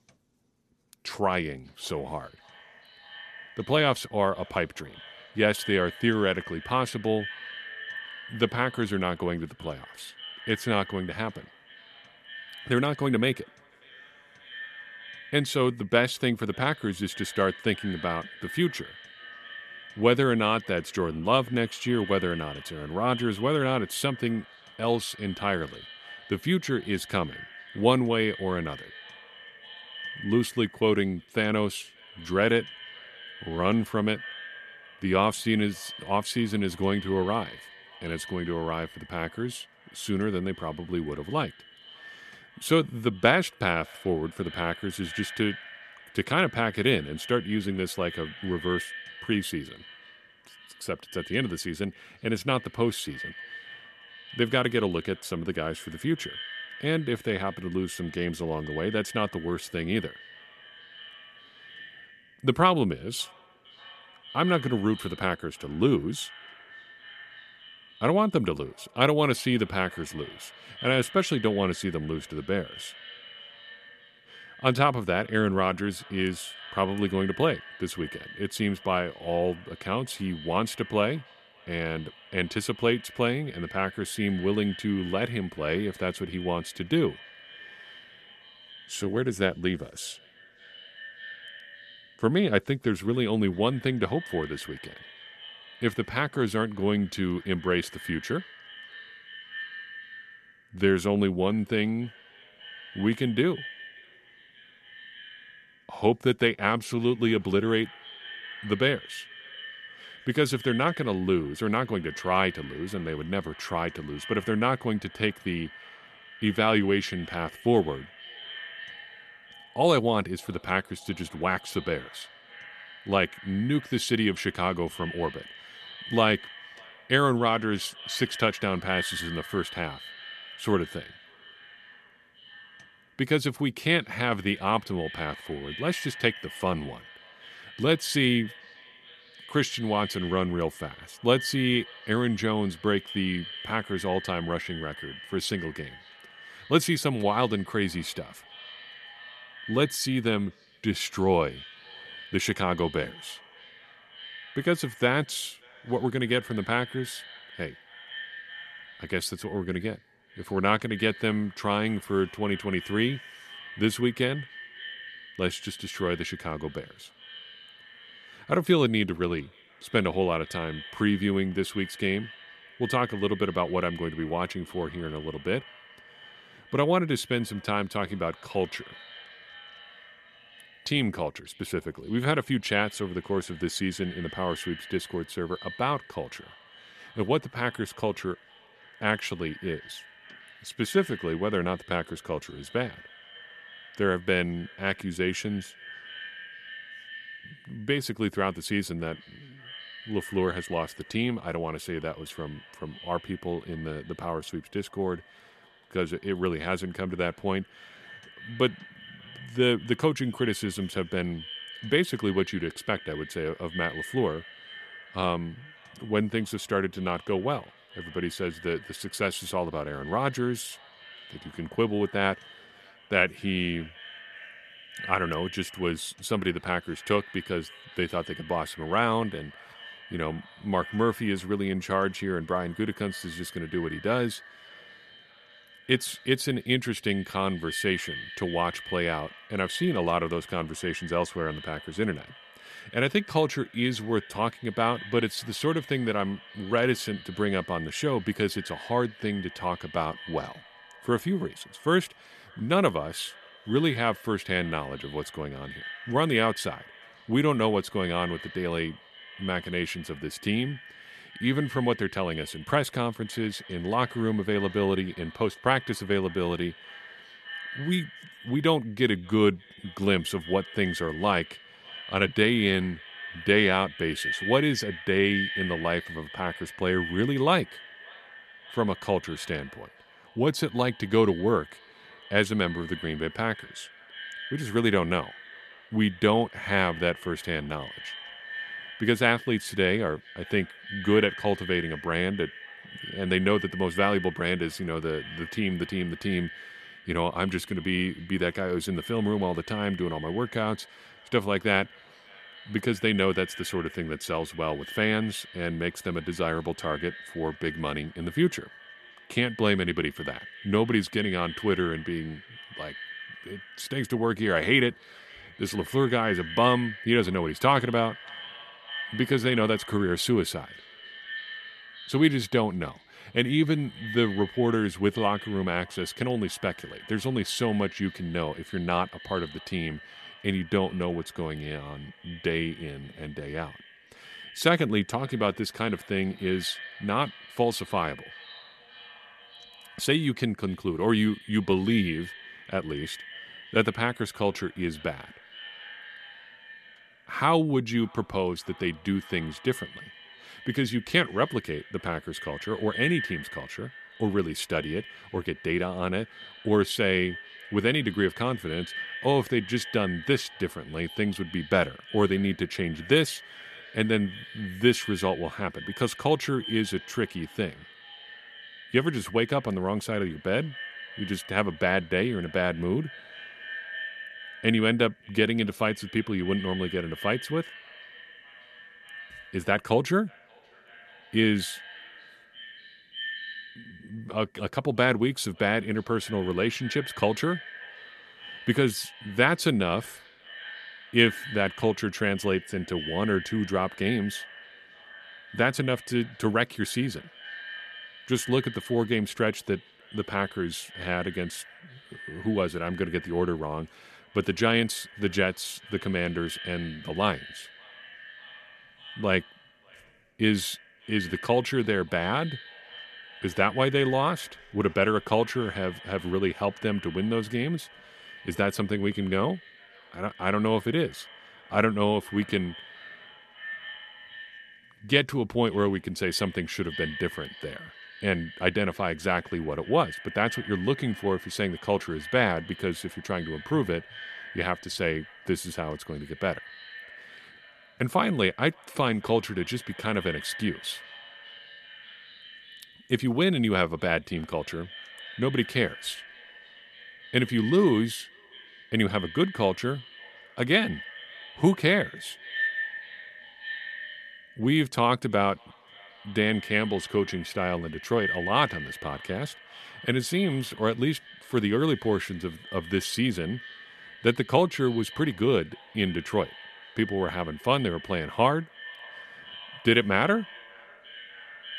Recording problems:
echo of what is said; noticeable; throughout; 580 ms later, 15 dB below the speech

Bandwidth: 13.5 kHz